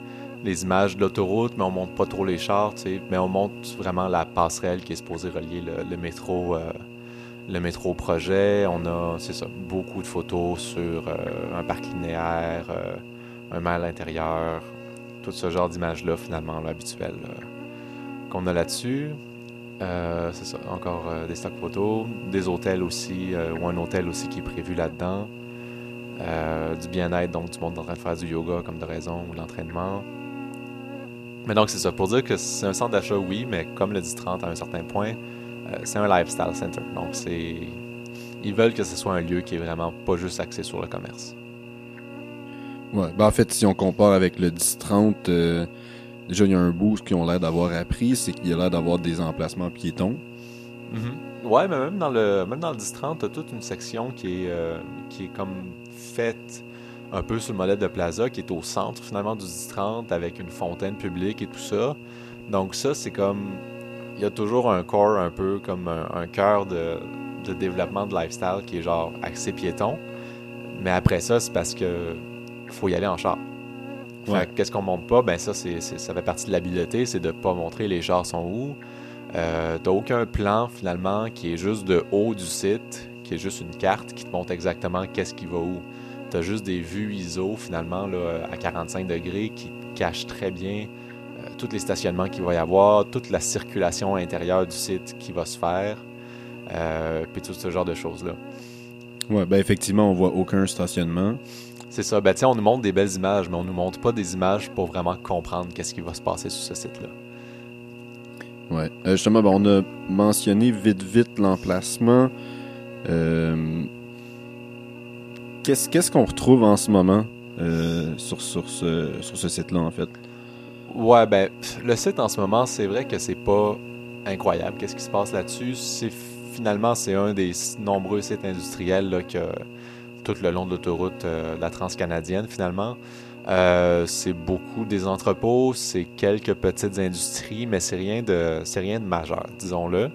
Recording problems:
electrical hum; noticeable; throughout; 60 Hz, 15 dB below the speech

